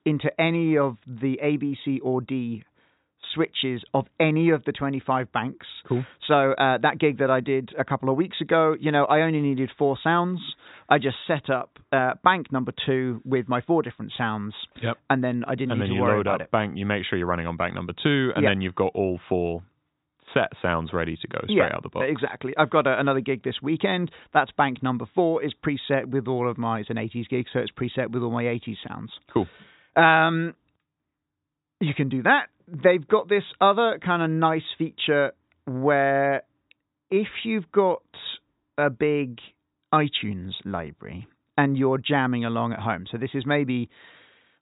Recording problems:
high frequencies cut off; severe; nothing above 4 kHz

